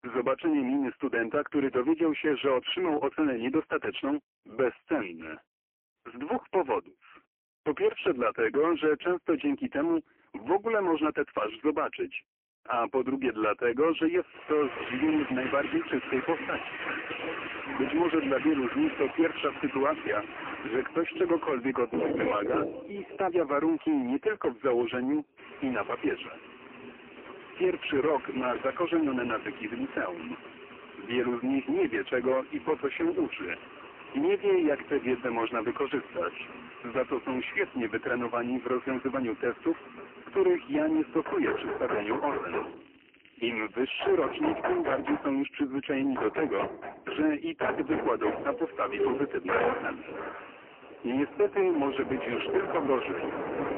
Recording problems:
phone-call audio; poor line; nothing above 3 kHz
distortion; slight; 10% of the sound clipped
household noises; loud; from 15 s on; 8 dB below the speech
crackling; faint; from 42 to 44 s; 25 dB below the speech

